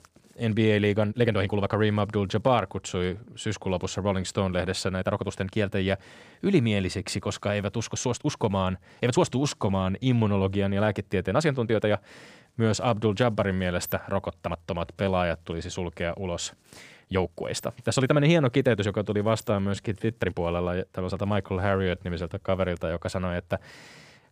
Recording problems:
uneven, jittery; strongly; from 1 to 23 s

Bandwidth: 14.5 kHz